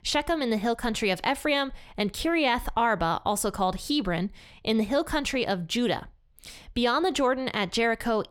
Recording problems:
none

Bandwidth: 17.5 kHz